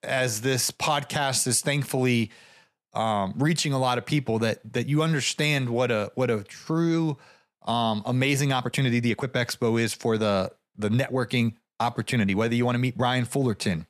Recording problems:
uneven, jittery; strongly; from 4.5 to 13 s

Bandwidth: 14 kHz